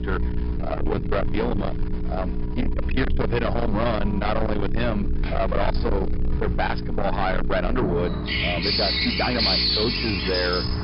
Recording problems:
distortion; heavy; 7 dB below the speech
high frequencies cut off; noticeable; nothing above 5.5 kHz
animal sounds; loud; throughout; 1 dB below the speech
electrical hum; noticeable; throughout; 60 Hz, 15 dB below the speech
uneven, jittery; strongly; from 0.5 to 10 s

